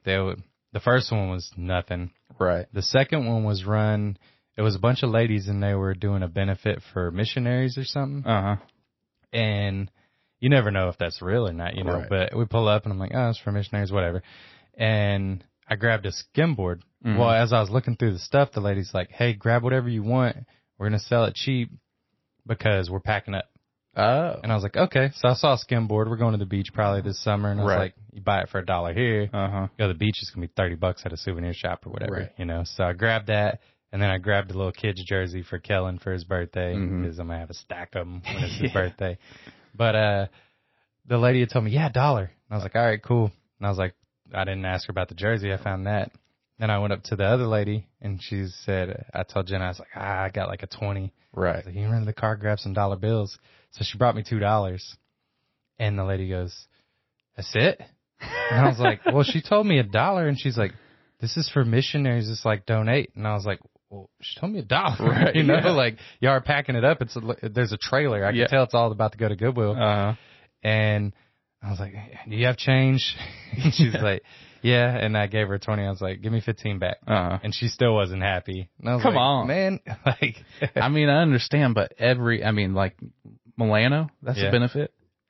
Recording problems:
garbled, watery; slightly; nothing above 5.5 kHz

